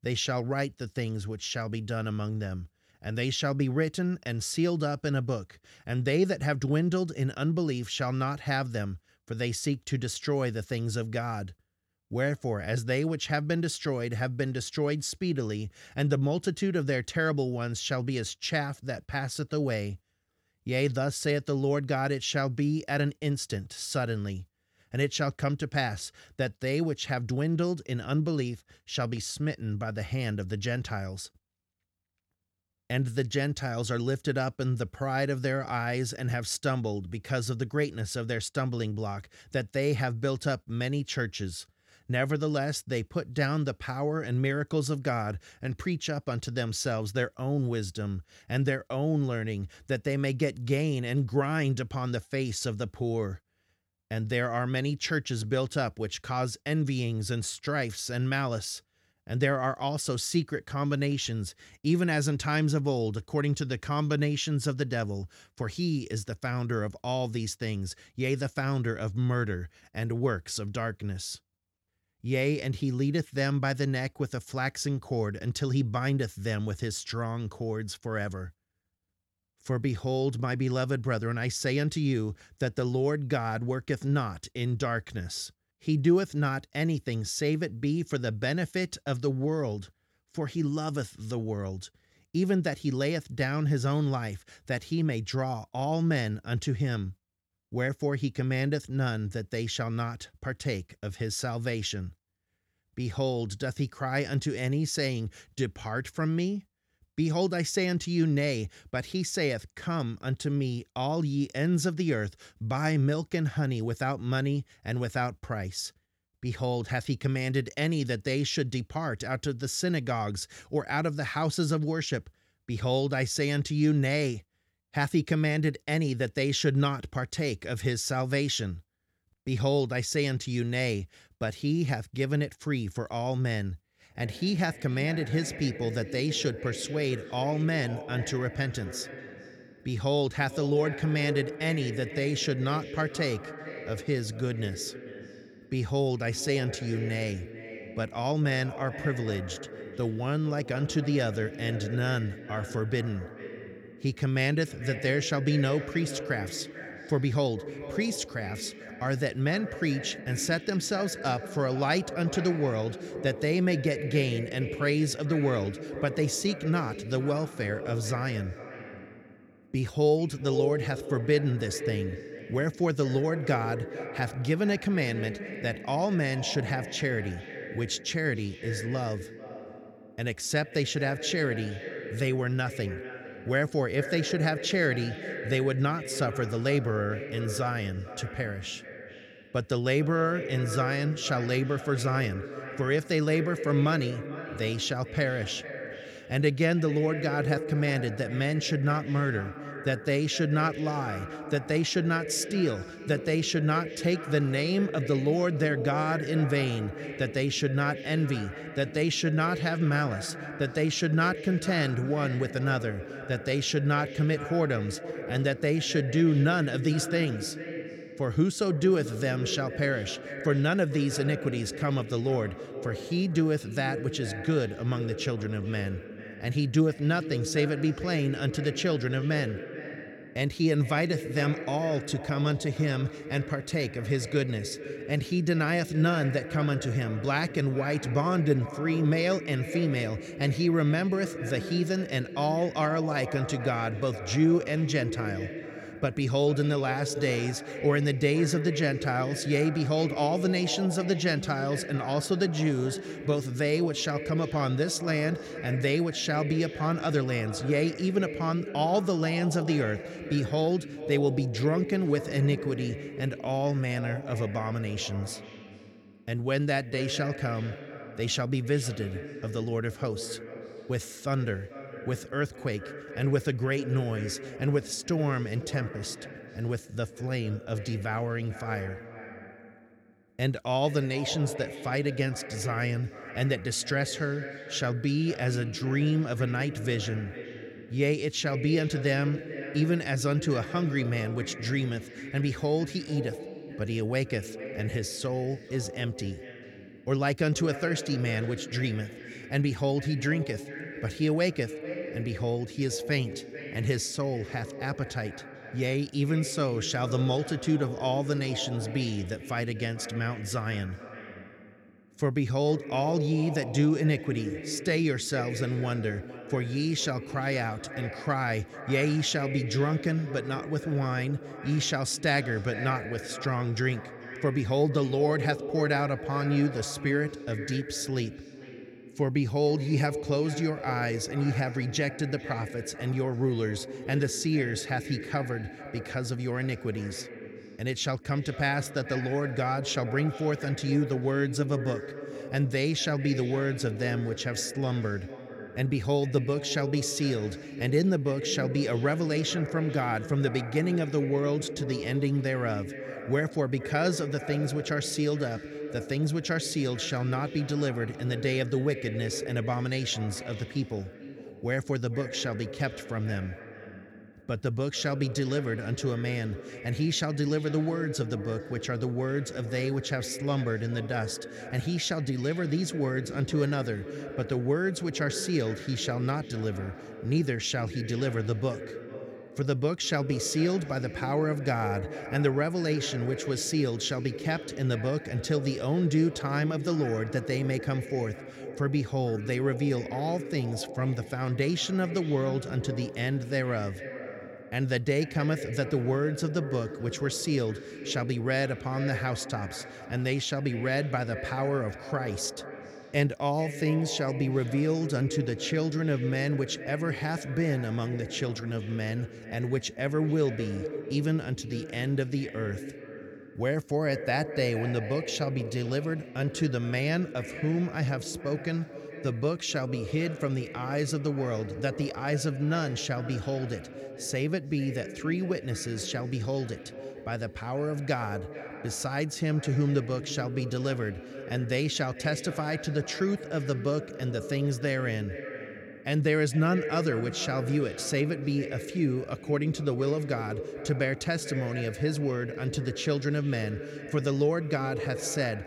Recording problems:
echo of what is said; strong; from 2:14 on; 440 ms later, 10 dB below the speech

